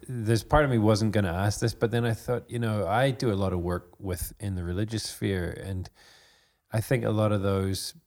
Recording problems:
none

